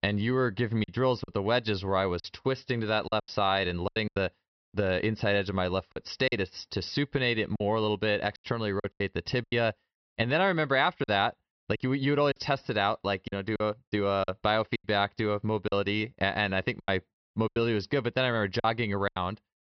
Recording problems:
high frequencies cut off; noticeable; nothing above 5.5 kHz
choppy; very; 9% of the speech affected

